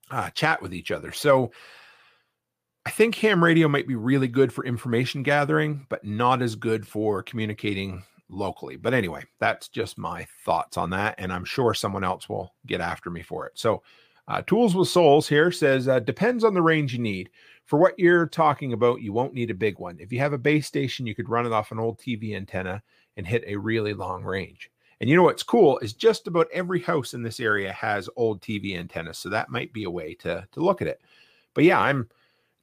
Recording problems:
none

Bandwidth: 15 kHz